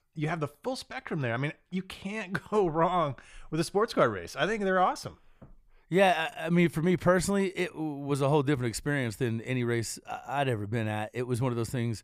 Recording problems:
none

